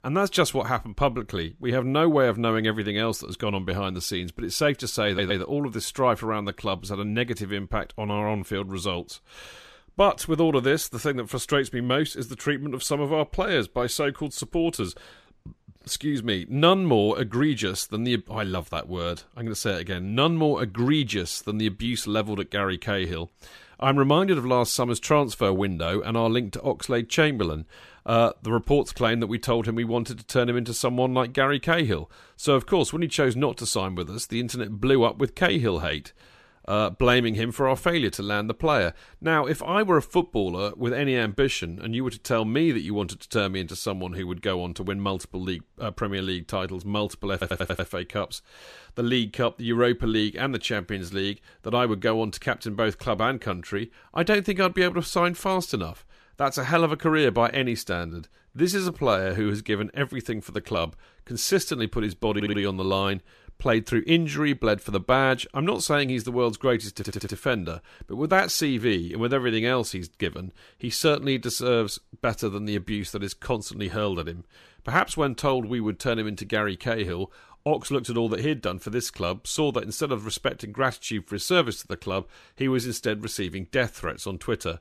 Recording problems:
audio stuttering; 4 times, first at 5 s

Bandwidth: 14 kHz